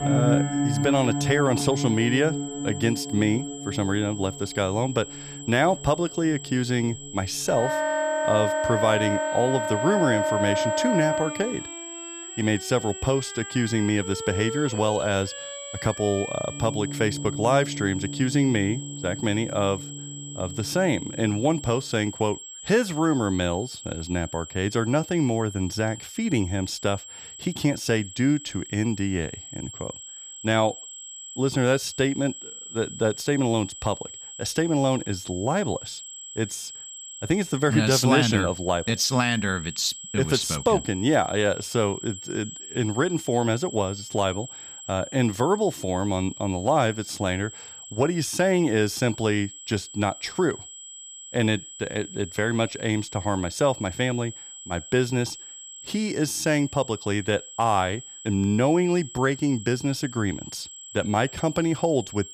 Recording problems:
background music; loud; until 22 s; 4 dB below the speech
high-pitched whine; noticeable; throughout; 7.5 kHz, 10 dB below the speech

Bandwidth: 15 kHz